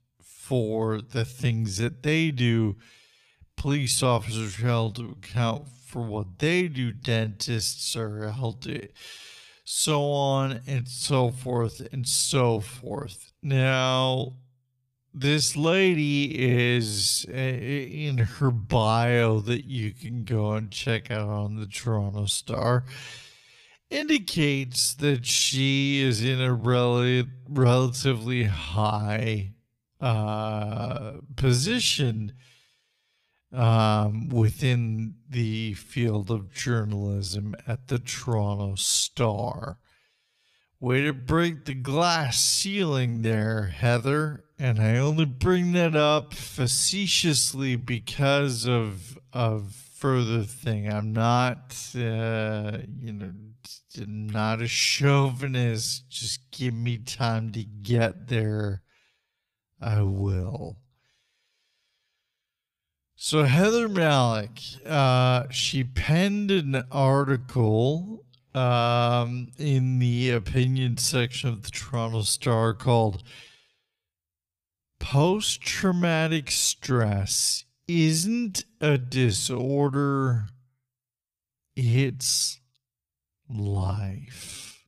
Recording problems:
wrong speed, natural pitch; too slow; 0.5 times normal speed

